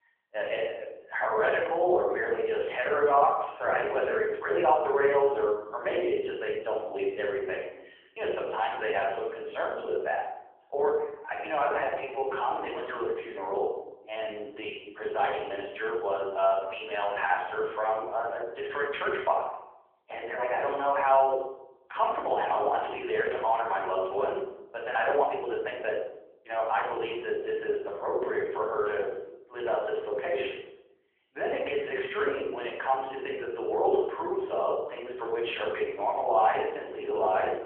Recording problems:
off-mic speech; far
room echo; noticeable; dies away in 0.8 s
phone-call audio
uneven, jittery; strongly; from 4.5 to 28 s

